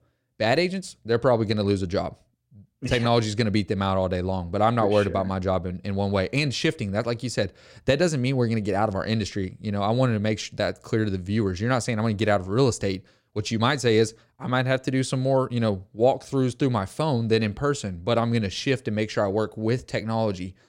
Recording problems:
none

